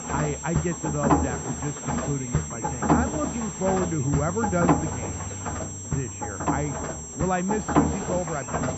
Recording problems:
muffled; very; fading above 1 kHz
machinery noise; very loud; throughout; 1 dB above the speech
high-pitched whine; loud; throughout; 7.5 kHz, 6 dB below the speech

